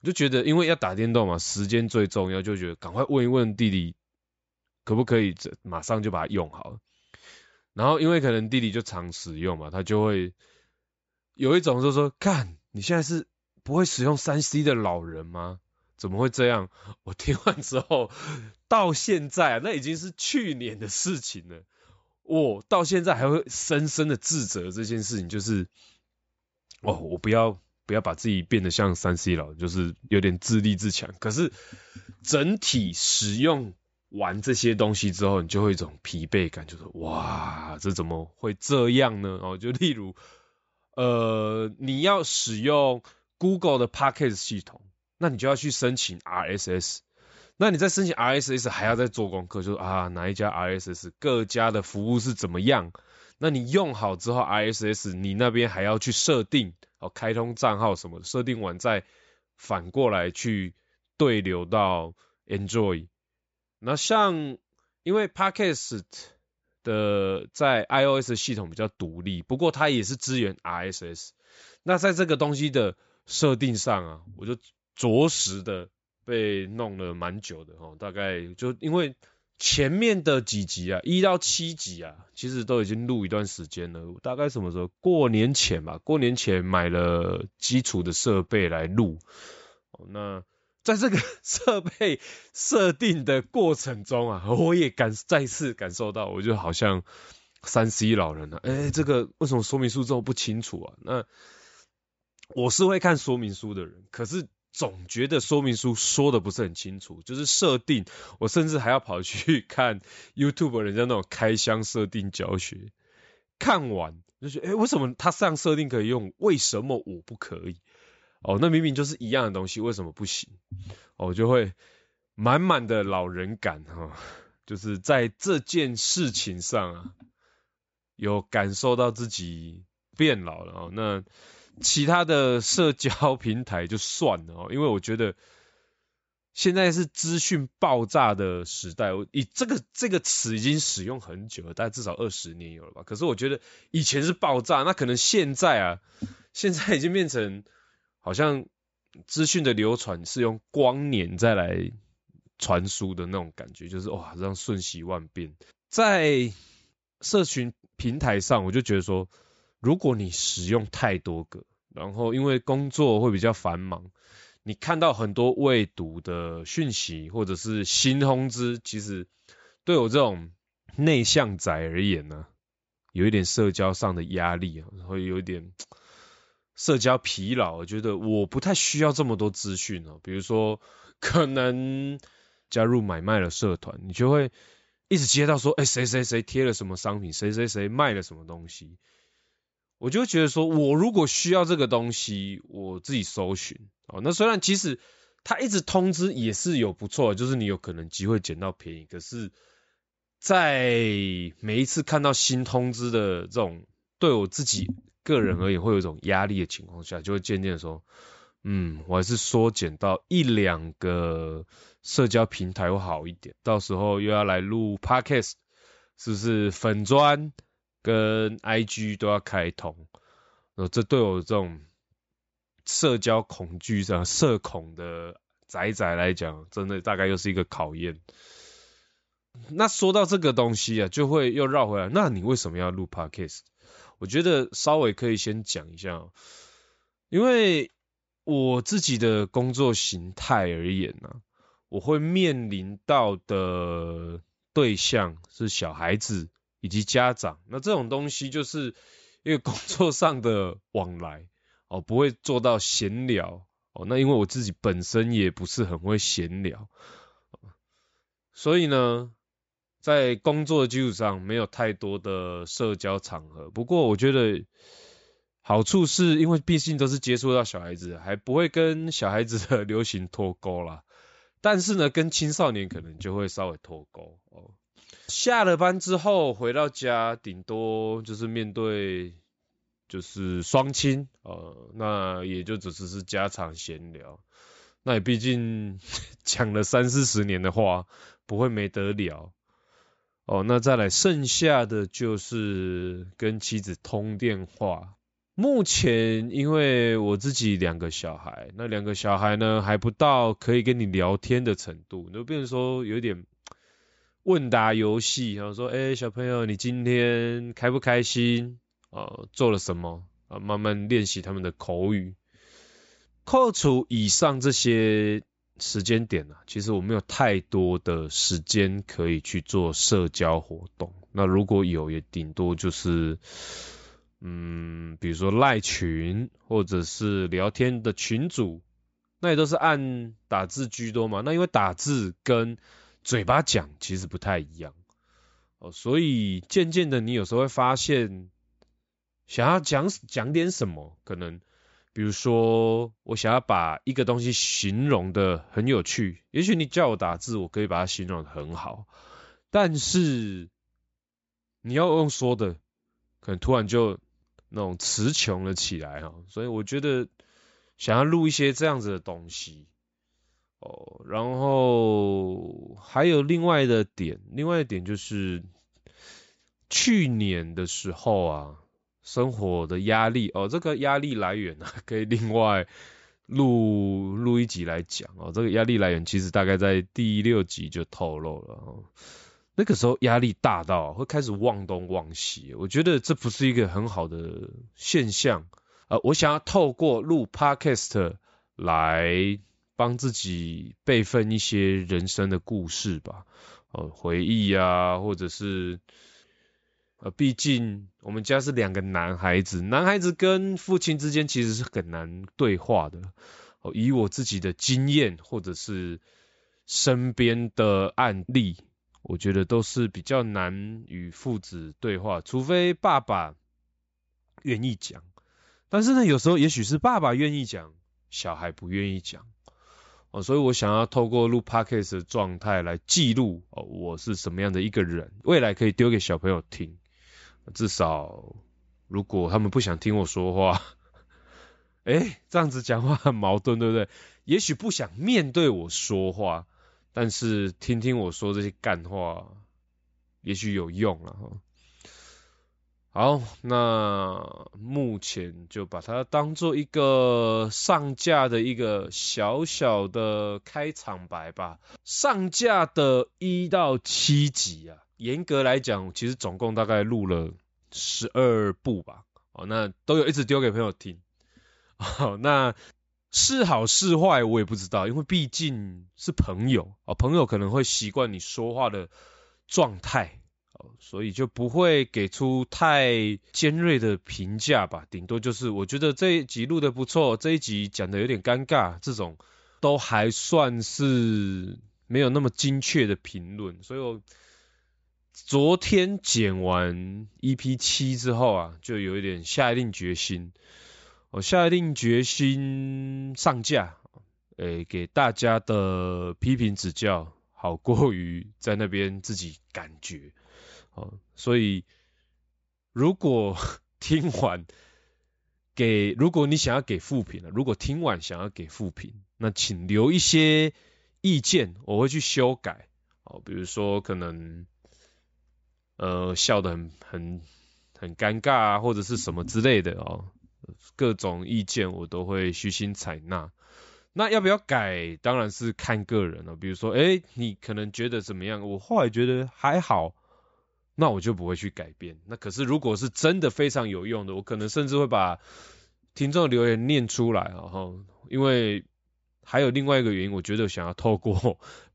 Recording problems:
high frequencies cut off; noticeable; nothing above 8 kHz

